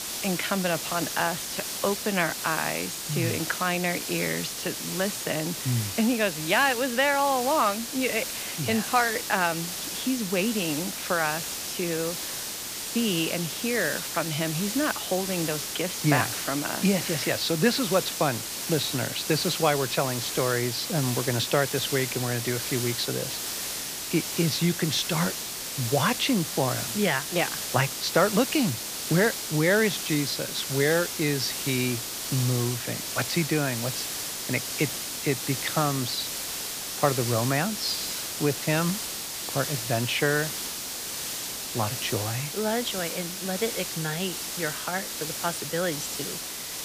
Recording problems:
hiss; loud; throughout; 3 dB below the speech

